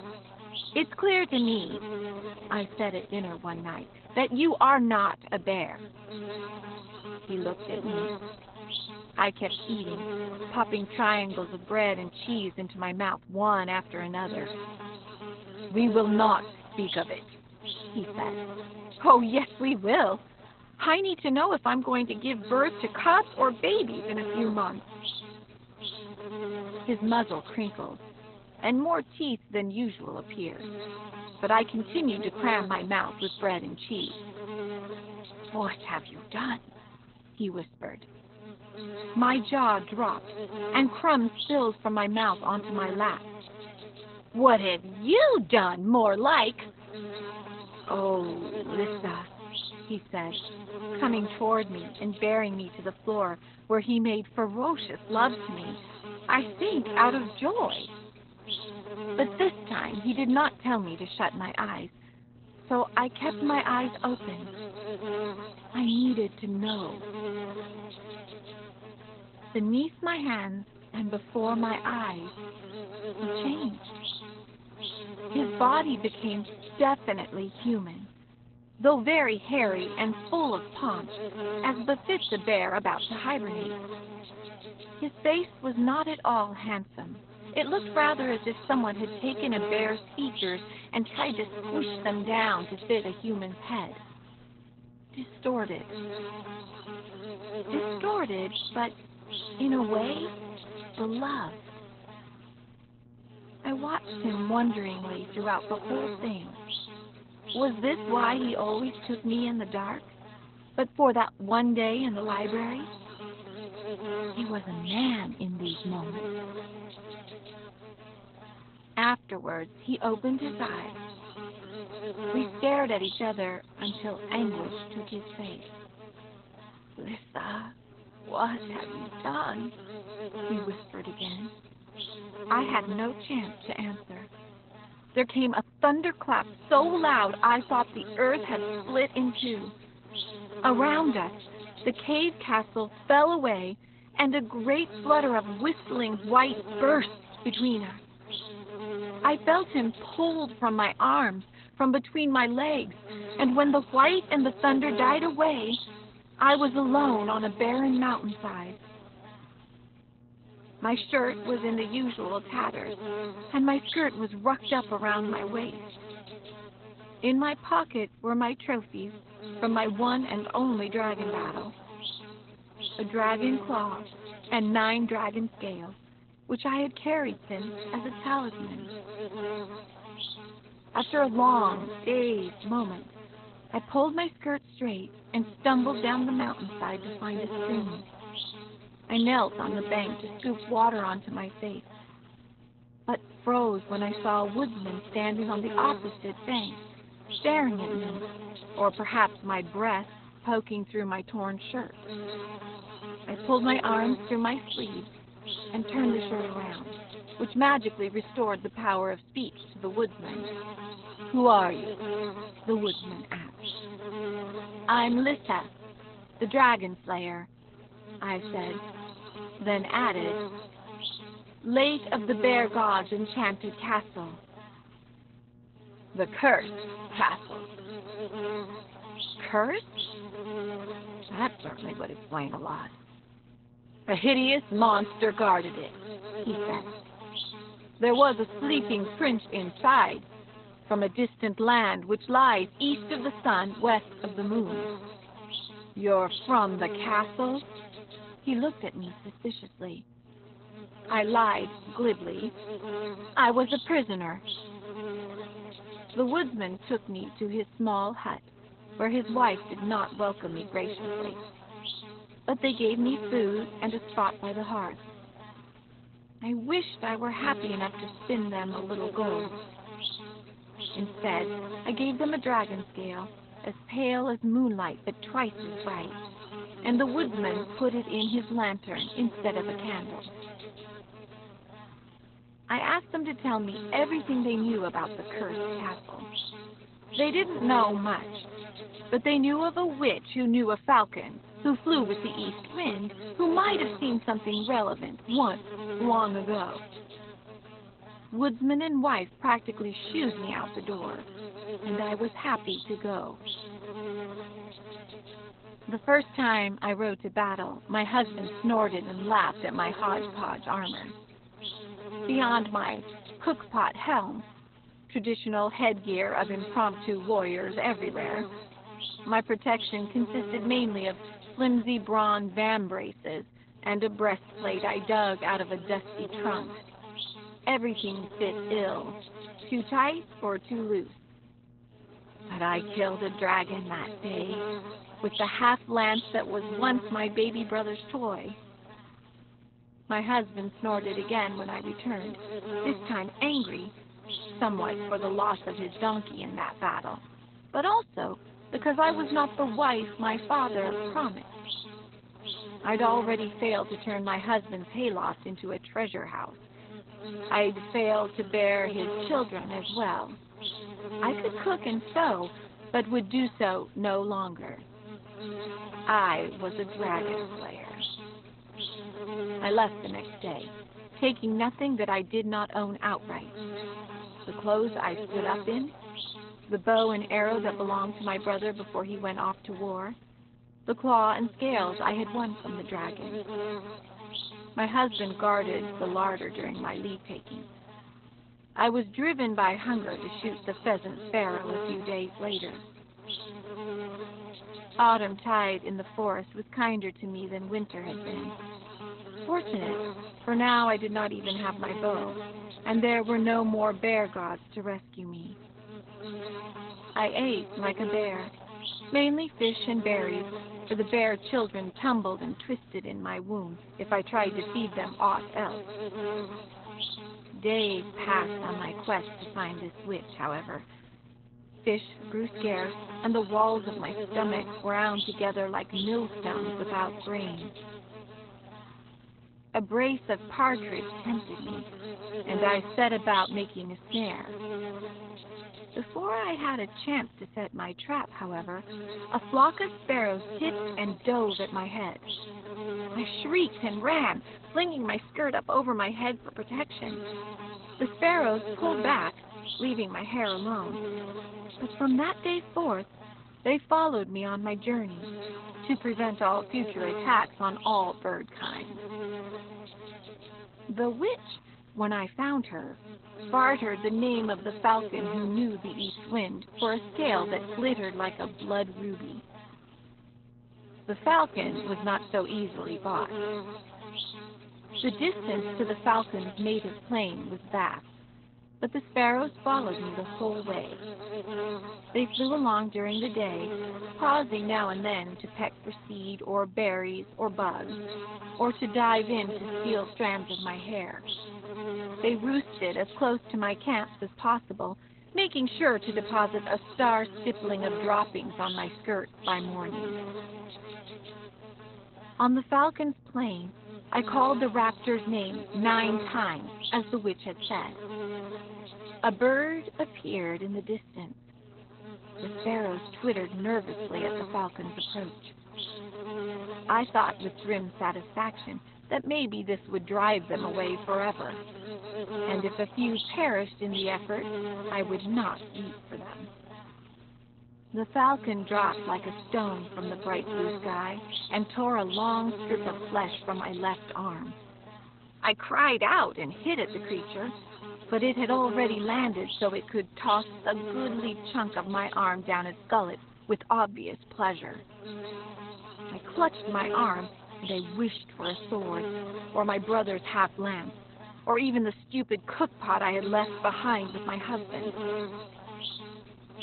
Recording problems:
garbled, watery; badly; nothing above 4 kHz
electrical hum; noticeable; throughout; 60 Hz, 15 dB below the speech

